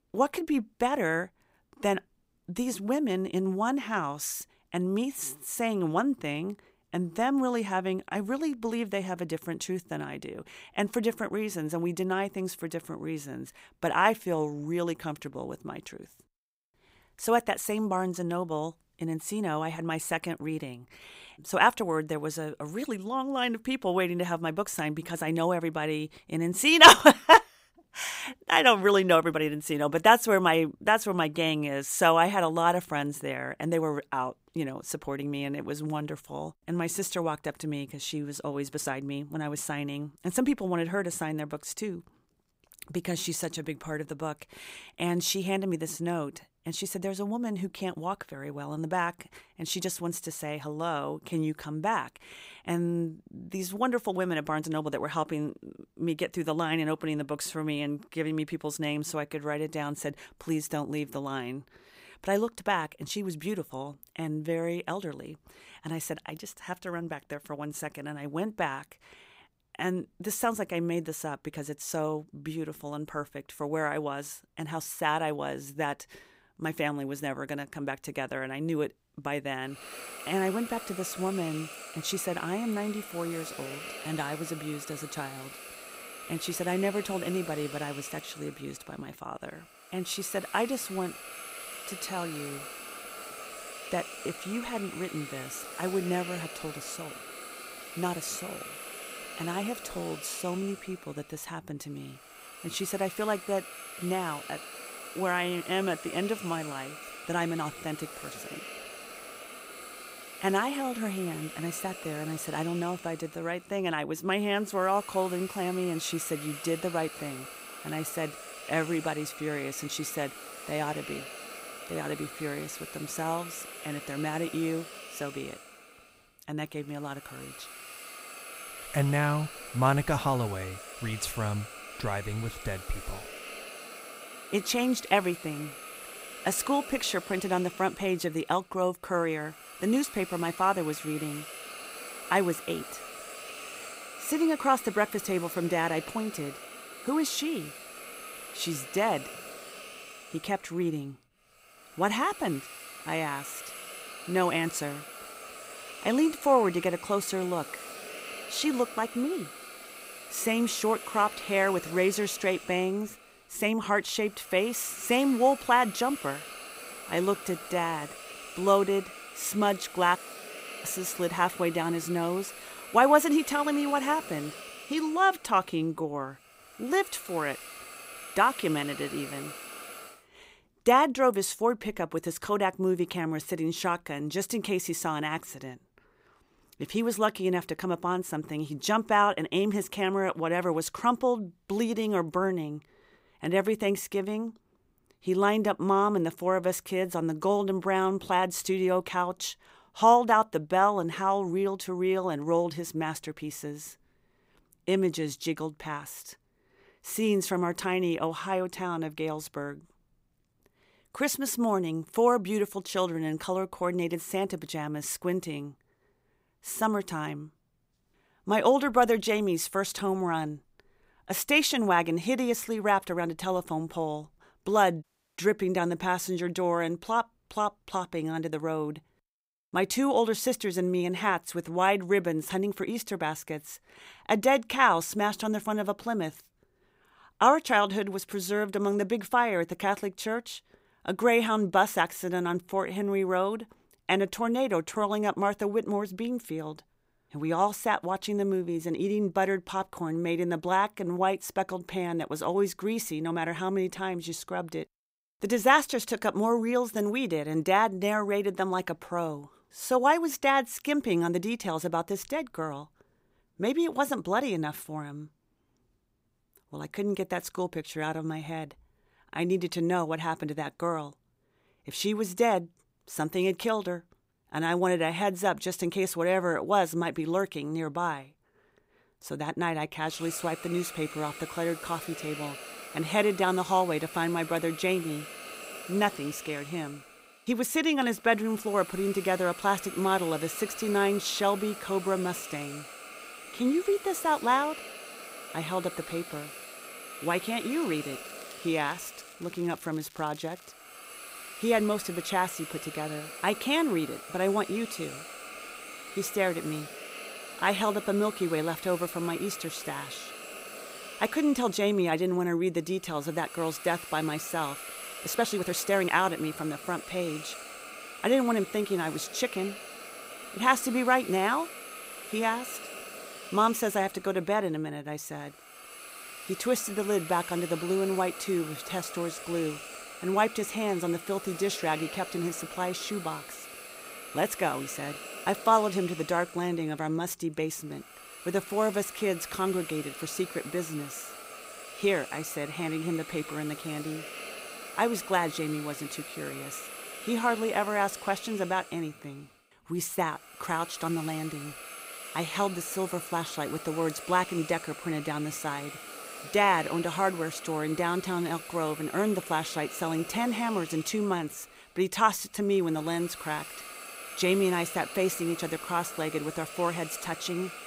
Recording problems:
hiss; noticeable; from 1:20 to 3:00 and from 4:40 on; 10 dB below the speech
crackling; faint; from 4:58 to 5:01; 25 dB below the speech
uneven, jittery; strongly; from 35 s to 5:35
audio cutting out; at 2:50 for 0.5 s and at 3:45

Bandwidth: 15.5 kHz